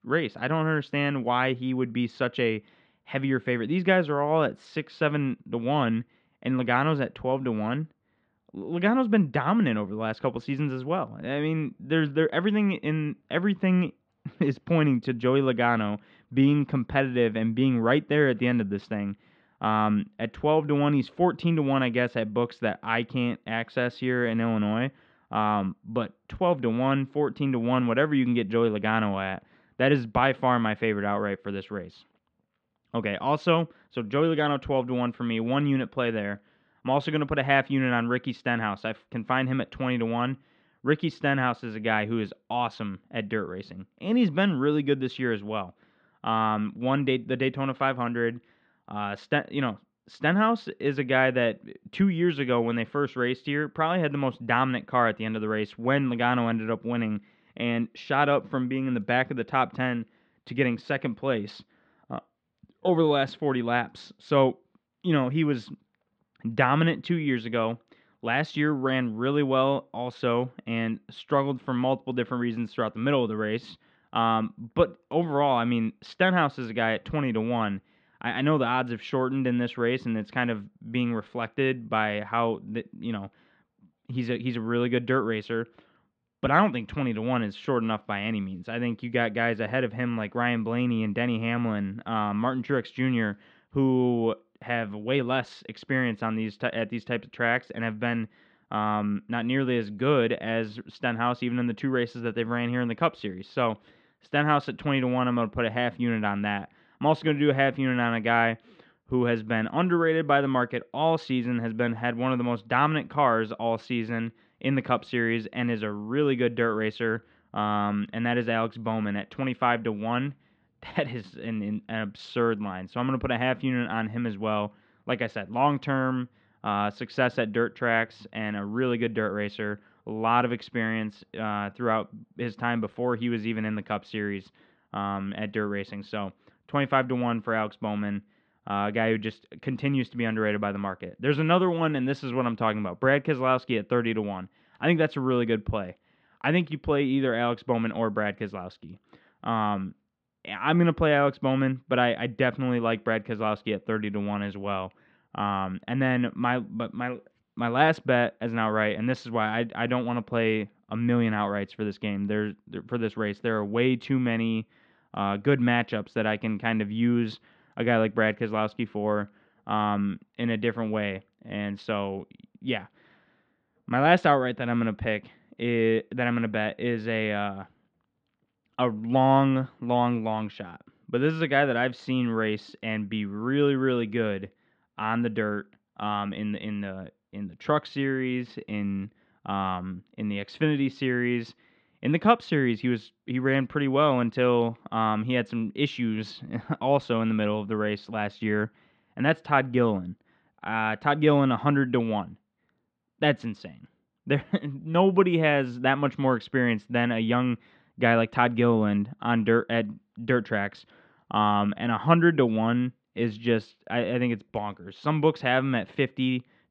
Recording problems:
muffled; slightly; fading above 4 kHz

